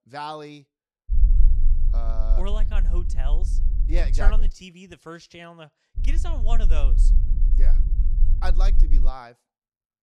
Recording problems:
low rumble; noticeable; from 1 to 4.5 s and from 6 to 9 s; 10 dB below the speech

